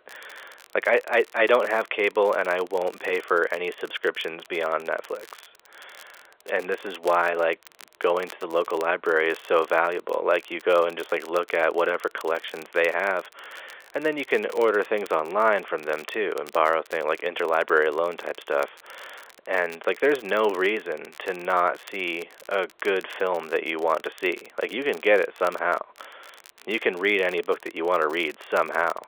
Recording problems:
phone-call audio; nothing above 3.5 kHz
crackle, like an old record; faint; 25 dB below the speech

